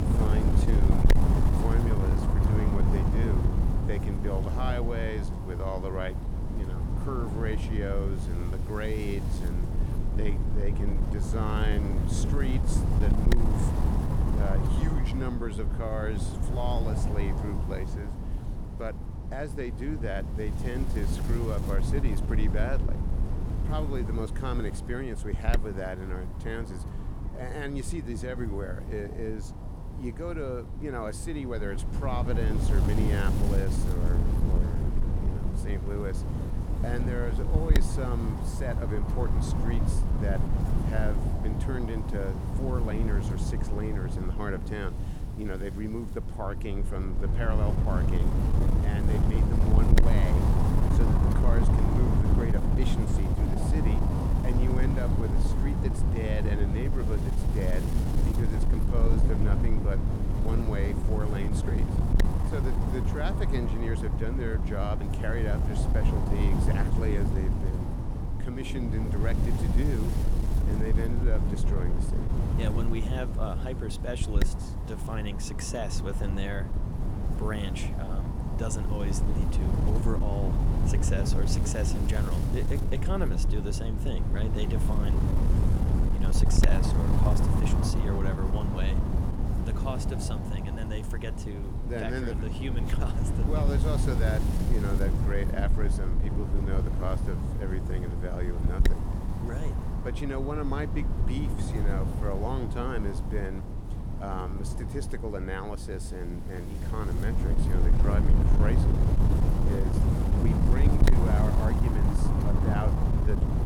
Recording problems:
wind noise on the microphone; heavy; 1 dB below the speech

